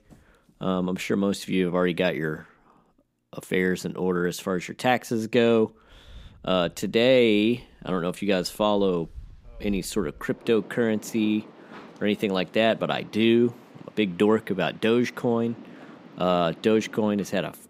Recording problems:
rain or running water; faint; throughout; 25 dB below the speech

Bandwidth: 15.5 kHz